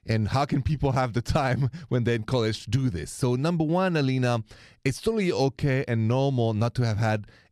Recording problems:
none

